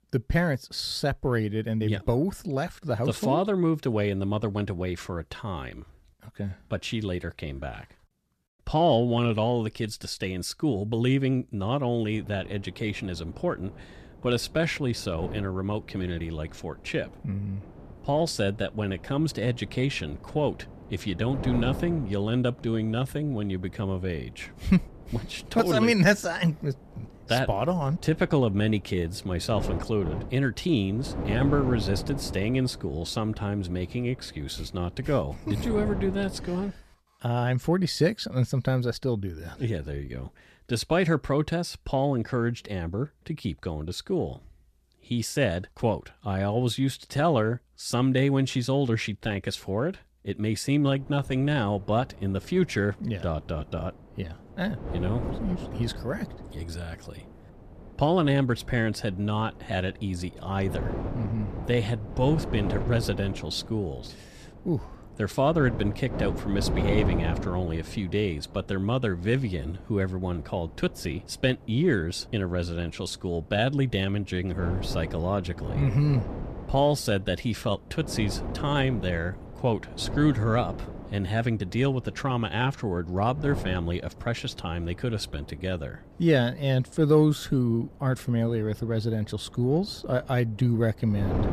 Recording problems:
wind noise on the microphone; occasional gusts; from 12 to 37 s and from 51 s on; 15 dB below the speech

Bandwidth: 14.5 kHz